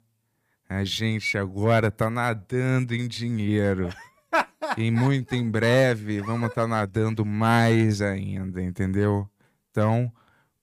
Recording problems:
none

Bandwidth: 15 kHz